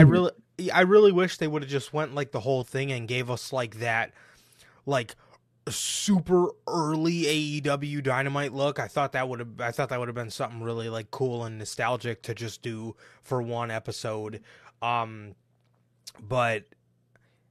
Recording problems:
abrupt cut into speech; at the start

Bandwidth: 13.5 kHz